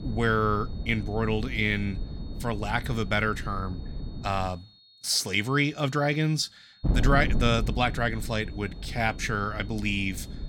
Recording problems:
wind noise on the microphone; occasional gusts; until 4.5 s and from 7 s on; 15 dB below the speech
high-pitched whine; faint; throughout; 4.5 kHz, 25 dB below the speech

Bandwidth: 17.5 kHz